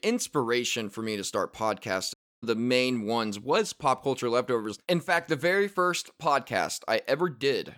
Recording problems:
audio cutting out; at 2 s

